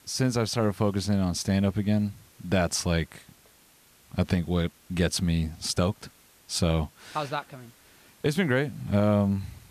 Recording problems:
hiss; faint; throughout; 30 dB below the speech

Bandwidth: 14.5 kHz